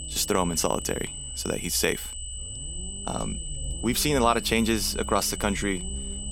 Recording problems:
high-pitched whine; loud; throughout; 8 kHz, 9 dB below the speech
low rumble; faint; throughout; 25 dB below the speech

